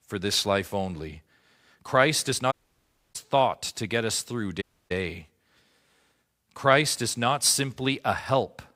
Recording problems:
audio cutting out; at 2.5 s for 0.5 s and at 4.5 s

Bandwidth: 15.5 kHz